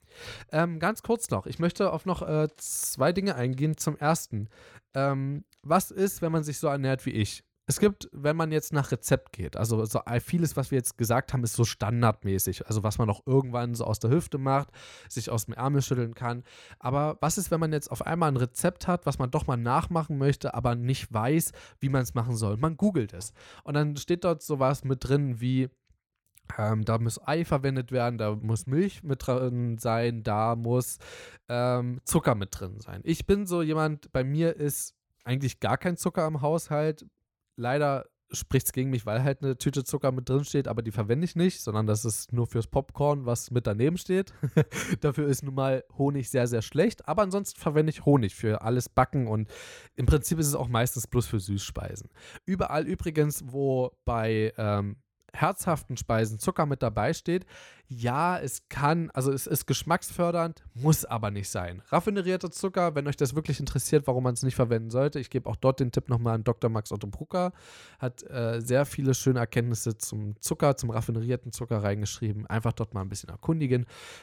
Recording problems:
none

